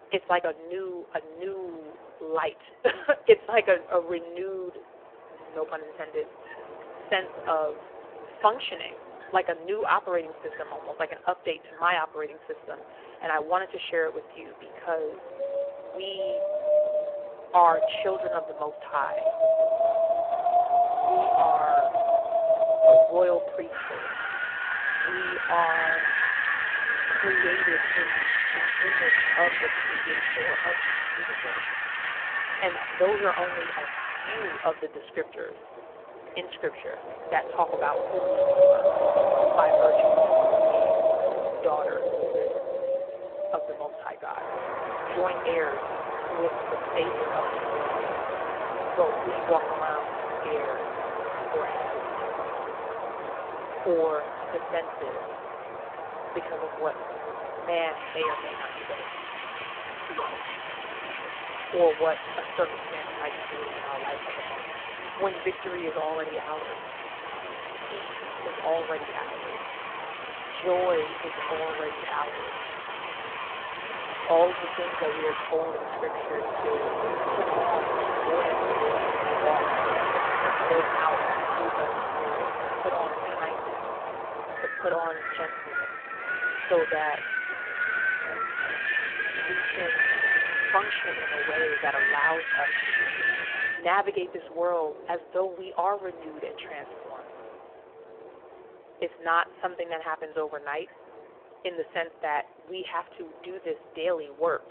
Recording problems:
phone-call audio; poor line
wind in the background; very loud; throughout; 3 dB above the speech

